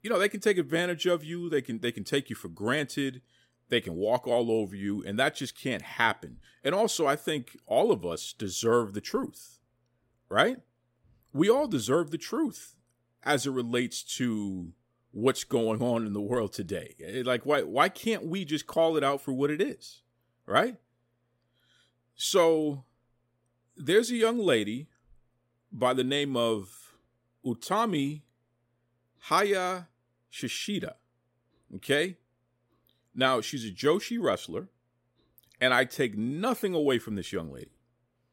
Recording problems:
none

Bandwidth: 16 kHz